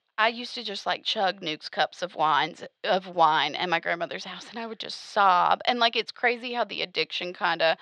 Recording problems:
thin; somewhat; fading below 500 Hz
muffled; very slightly; fading above 4 kHz

